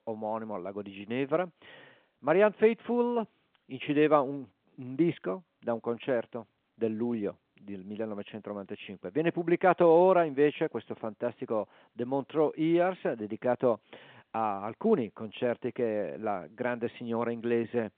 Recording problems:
phone-call audio

